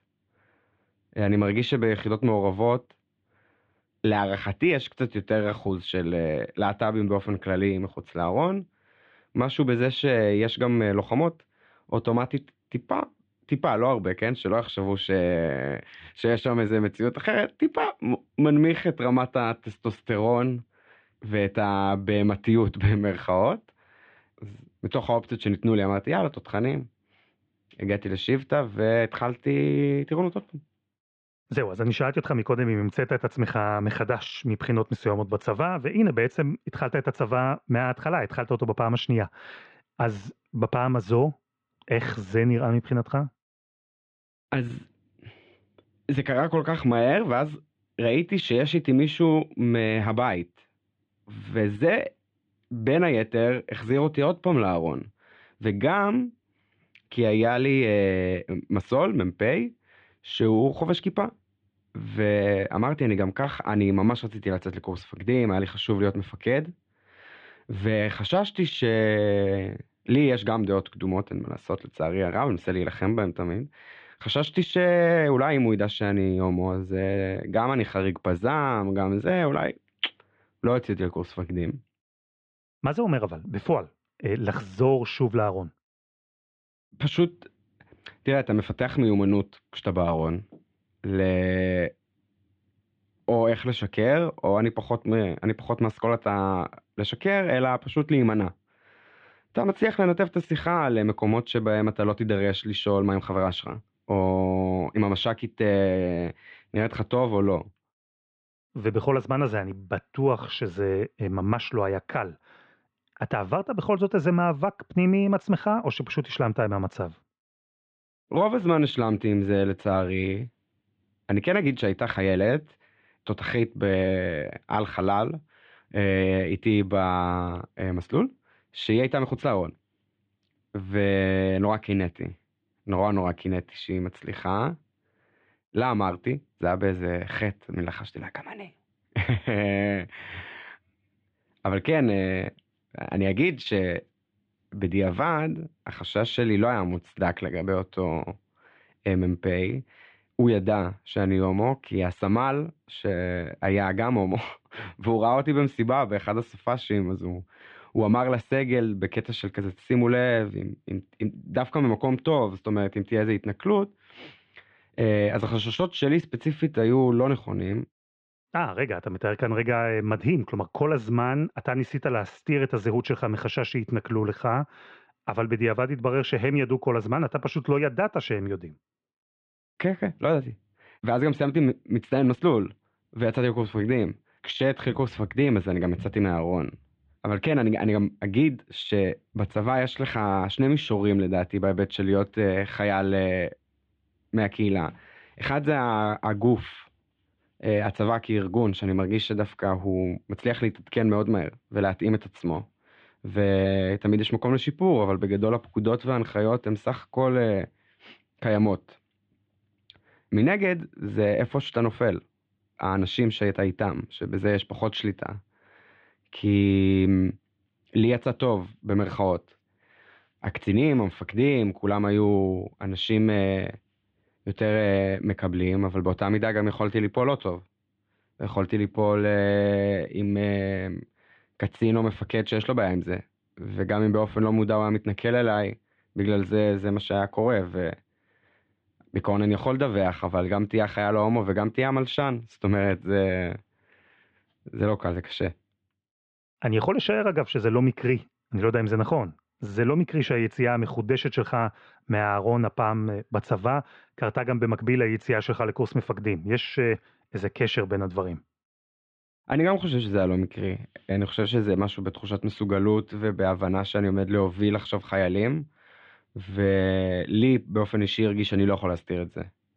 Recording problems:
muffled; very; fading above 3.5 kHz

